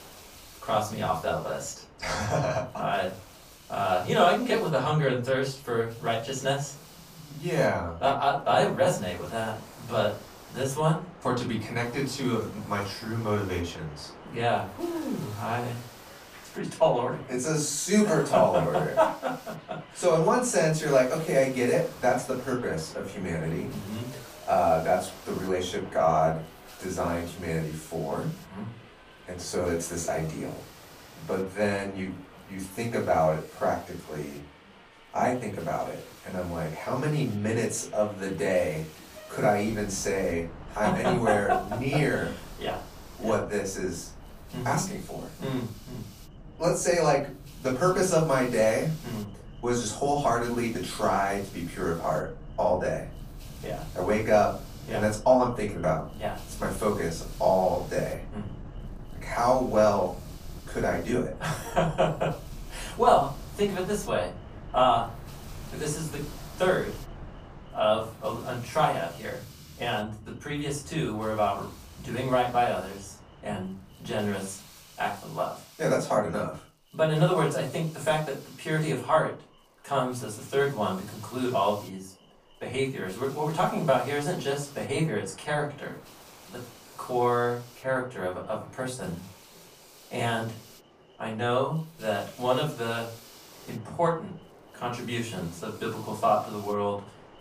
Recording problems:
off-mic speech; far
room echo; slight; dies away in 0.3 s
train or aircraft noise; noticeable; throughout; 20 dB below the speech
hiss; faint; throughout; 20 dB below the speech

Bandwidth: 15 kHz